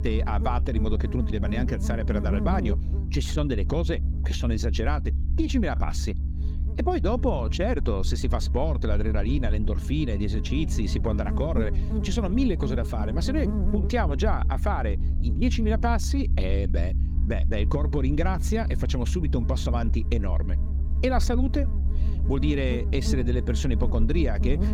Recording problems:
electrical hum; noticeable; throughout; 50 Hz, 10 dB below the speech
low rumble; noticeable; throughout; 15 dB below the speech

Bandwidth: 17.5 kHz